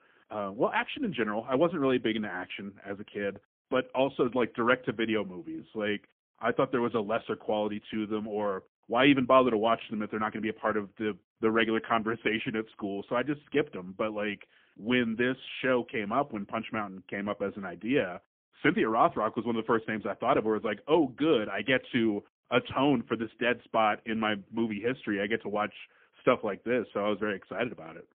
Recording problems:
phone-call audio; poor line; nothing above 3.5 kHz

